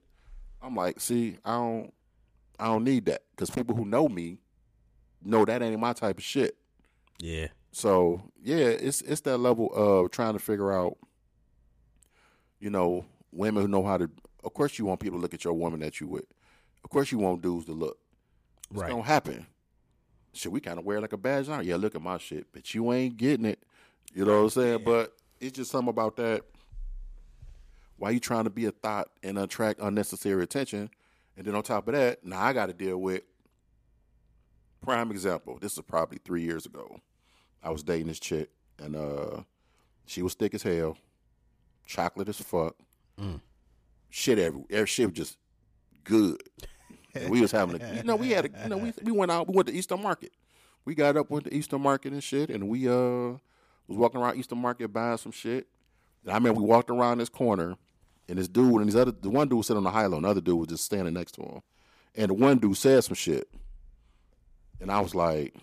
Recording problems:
none

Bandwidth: 15 kHz